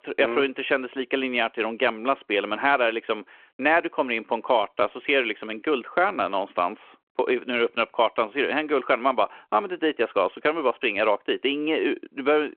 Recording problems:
phone-call audio

